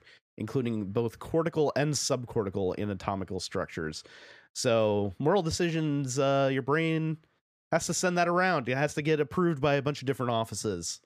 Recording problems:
none

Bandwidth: 15 kHz